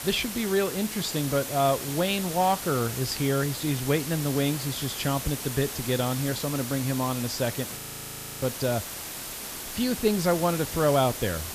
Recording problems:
hiss; loud; throughout; 6 dB below the speech
audio freezing; at 8 s for 0.5 s

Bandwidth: 14.5 kHz